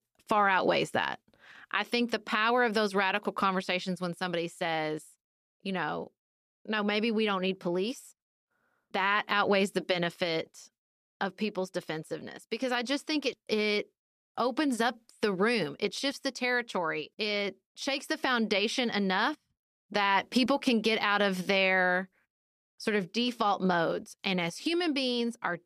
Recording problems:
none

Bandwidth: 14.5 kHz